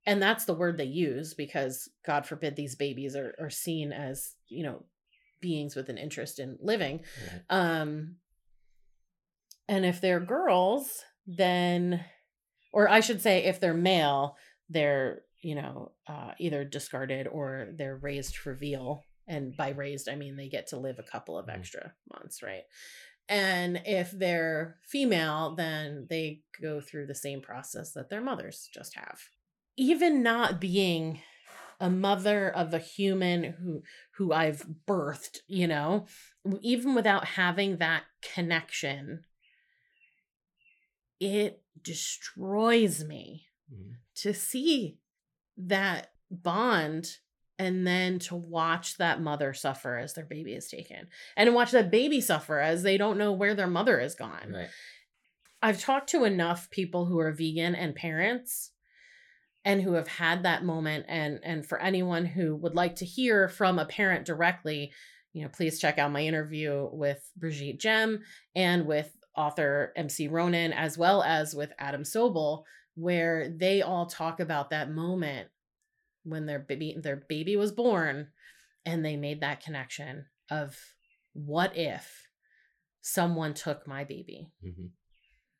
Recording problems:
none

